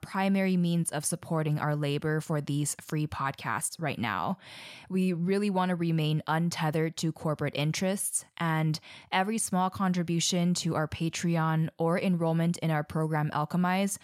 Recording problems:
none

